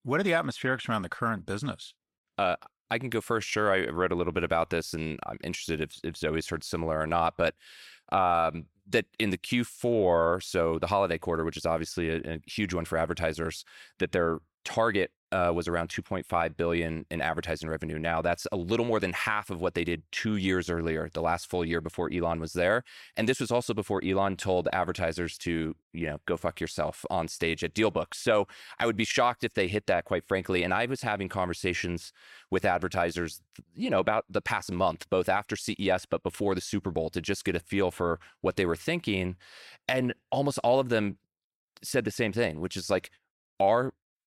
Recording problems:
none

